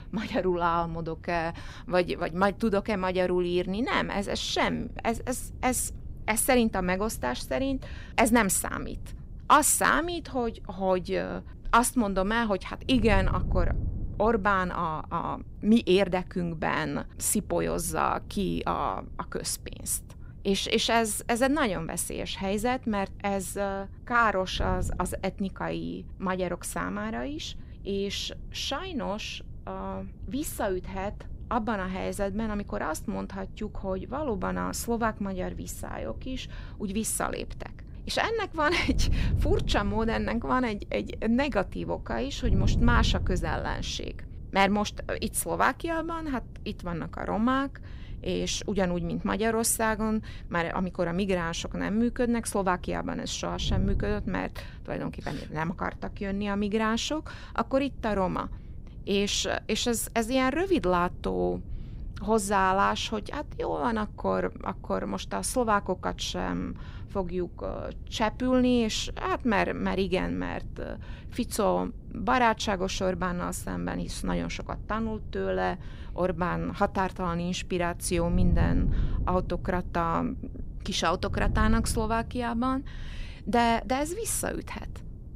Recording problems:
wind noise on the microphone; occasional gusts; 25 dB below the speech

